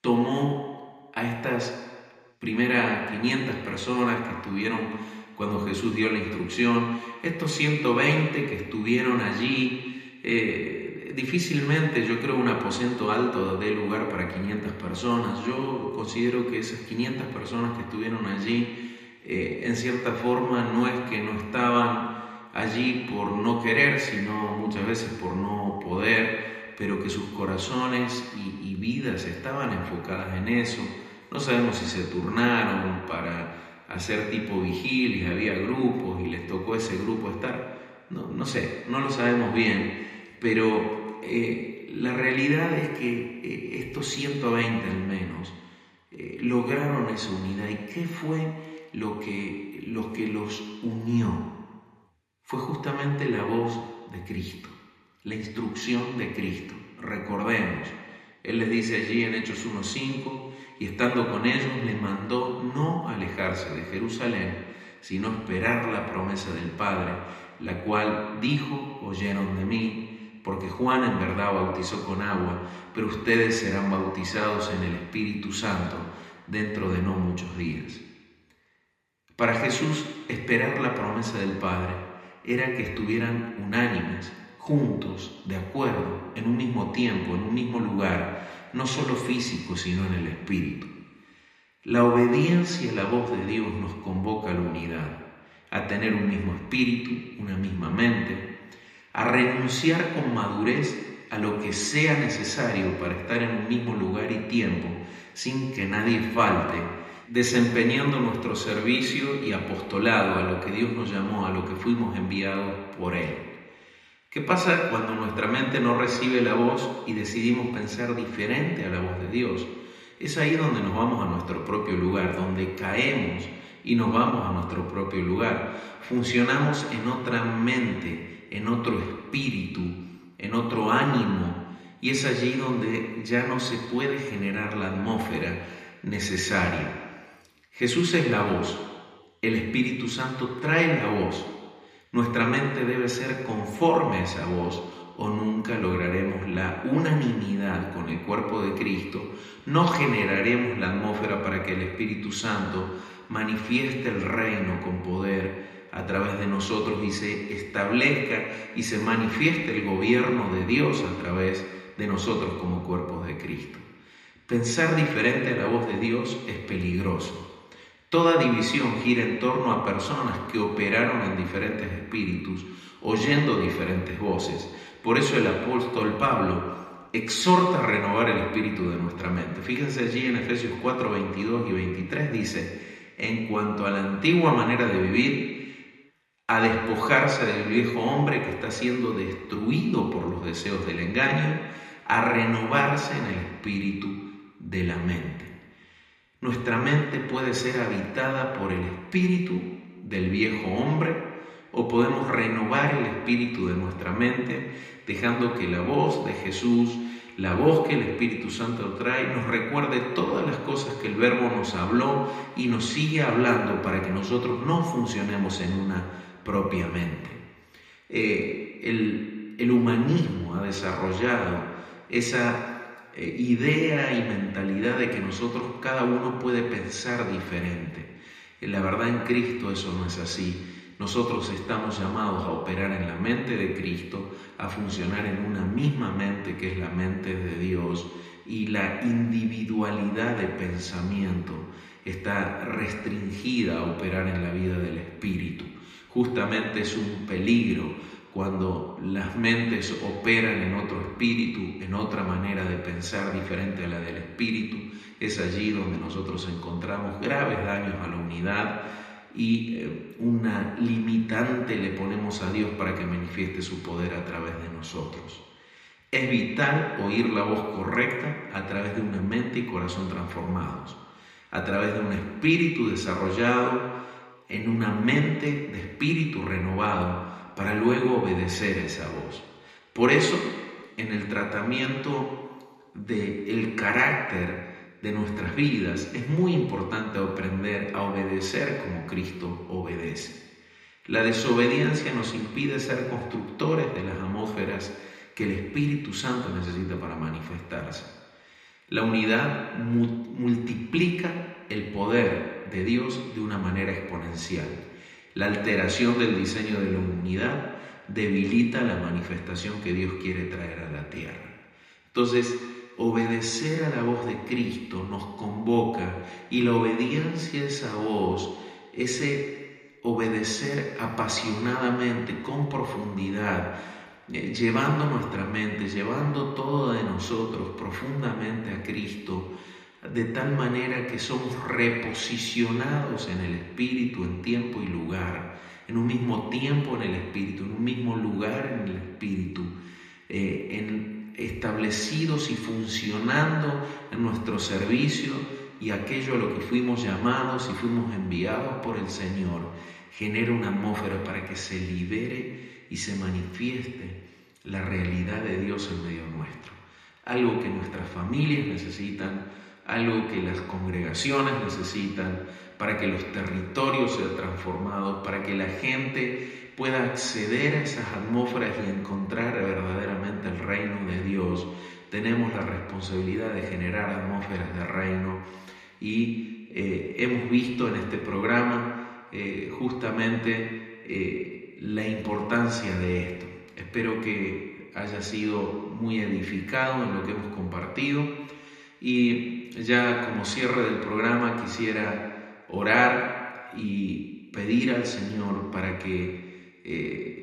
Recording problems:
room echo; noticeable; dies away in 1.5 s
off-mic speech; somewhat distant

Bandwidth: 14.5 kHz